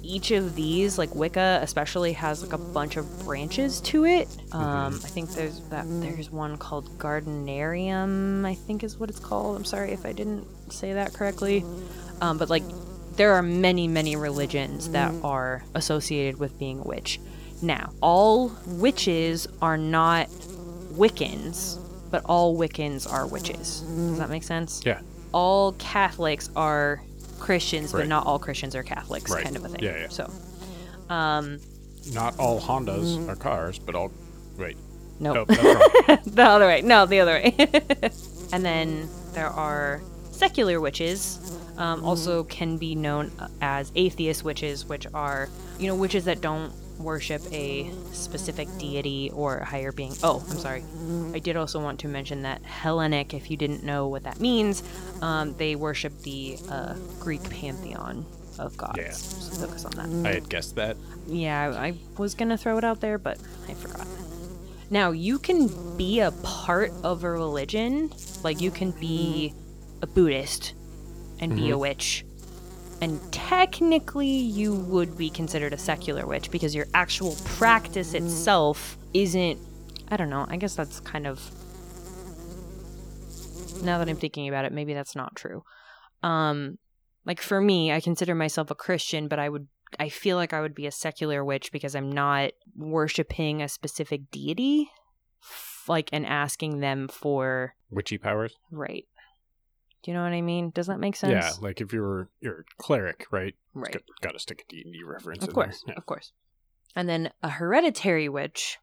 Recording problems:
electrical hum; noticeable; until 1:24; 50 Hz, 20 dB below the speech

